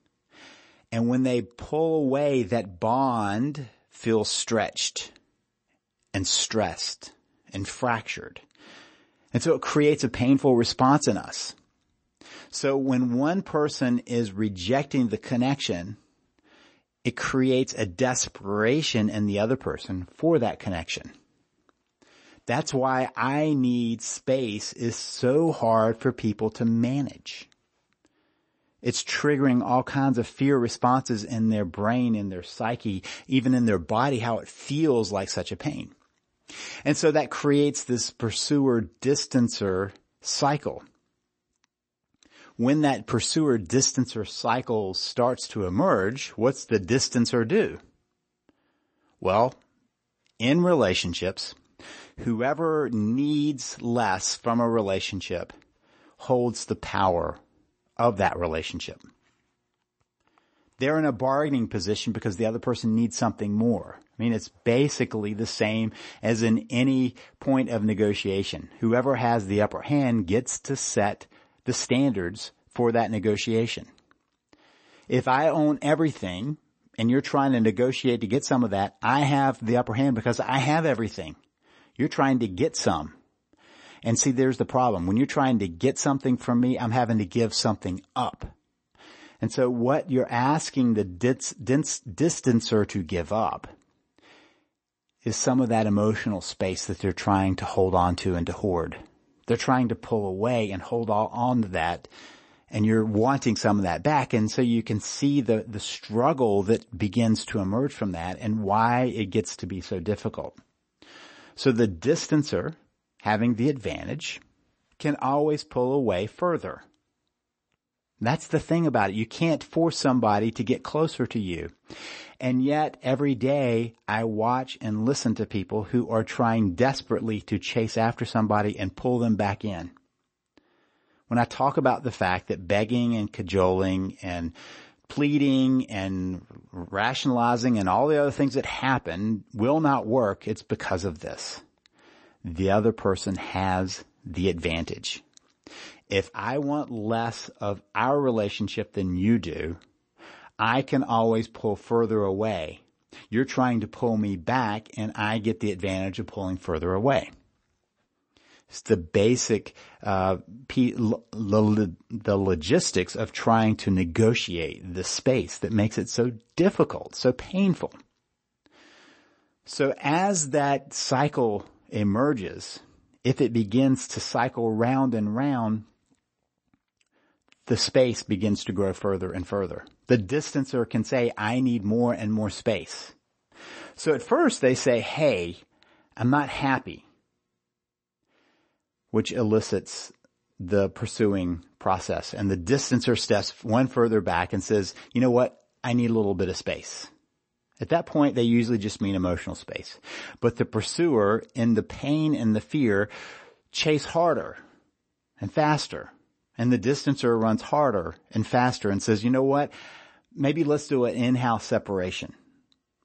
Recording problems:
garbled, watery; slightly; nothing above 8 kHz

